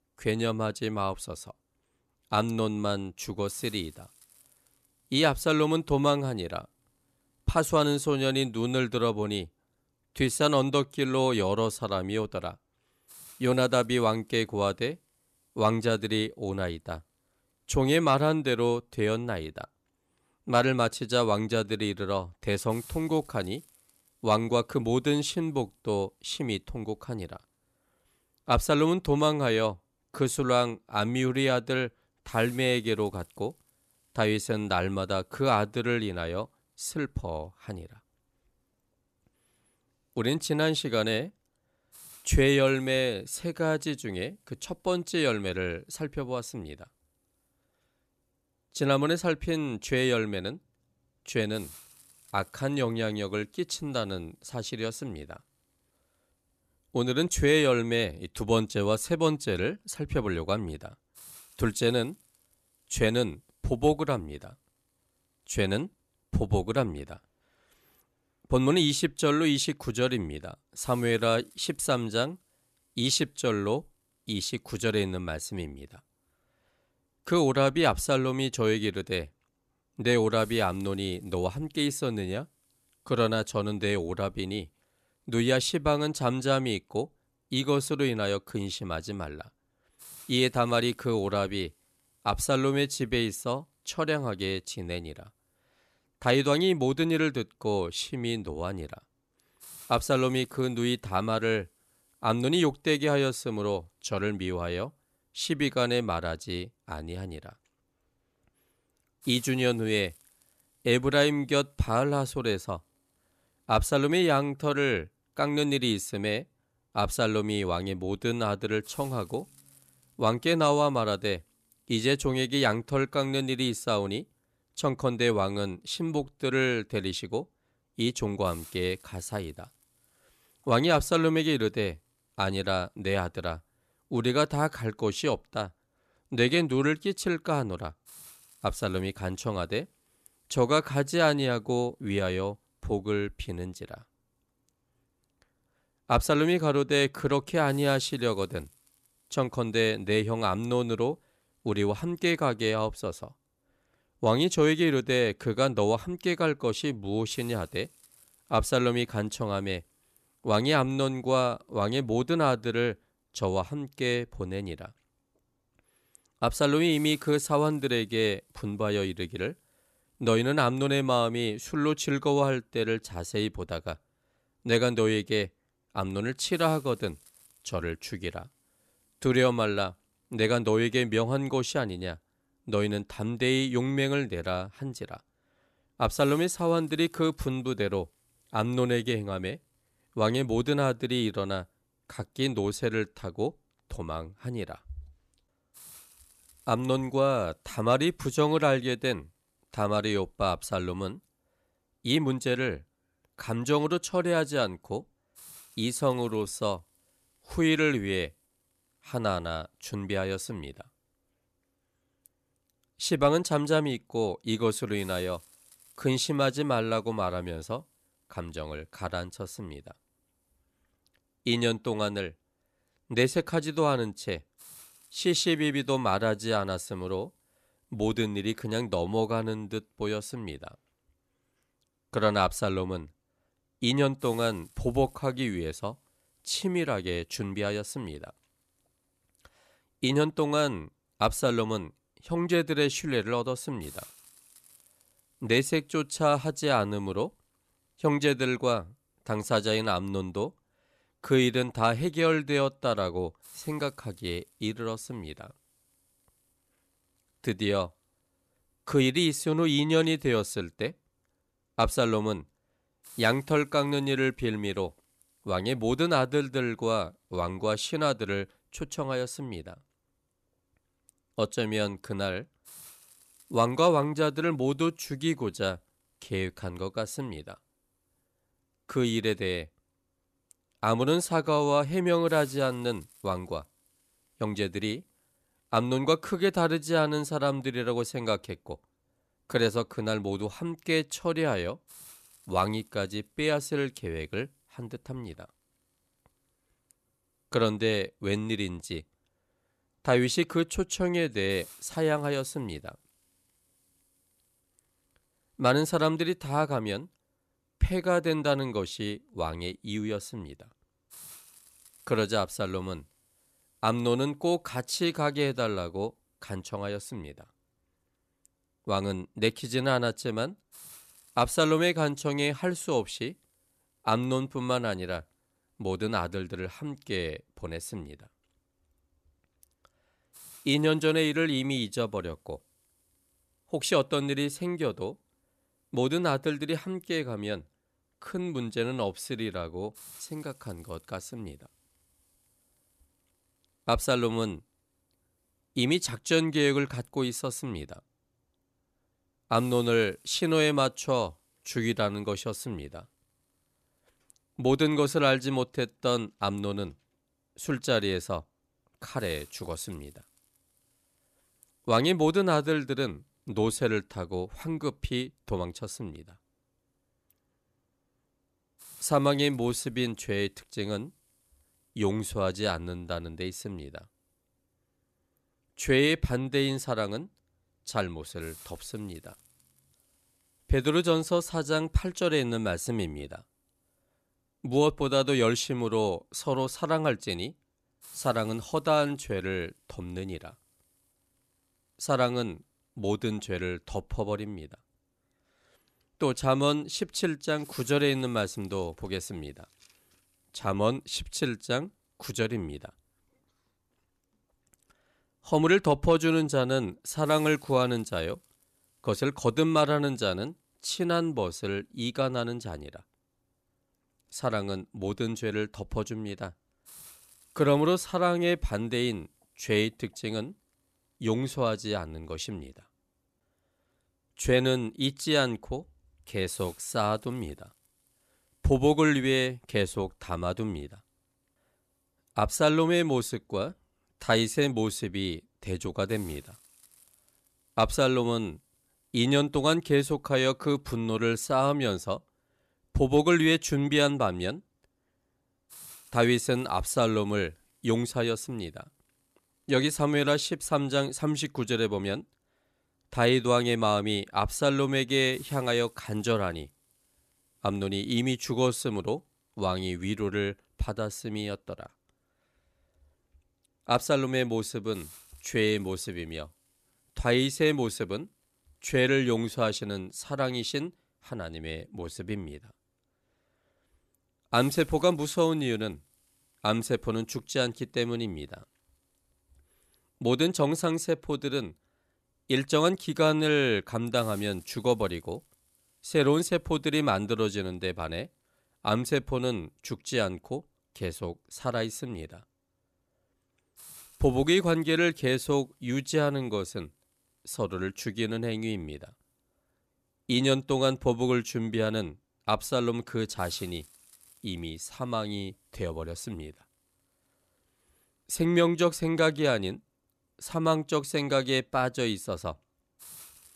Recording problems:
hiss; faint; throughout; 25 dB below the speech

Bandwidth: 14 kHz